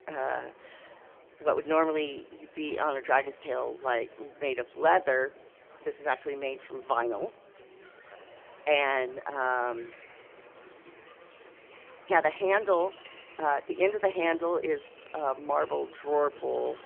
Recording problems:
phone-call audio; poor line; nothing above 3 kHz
background music; faint; throughout; 25 dB below the speech
chatter from many people; faint; throughout; 25 dB below the speech
uneven, jittery; strongly; from 1 to 16 s

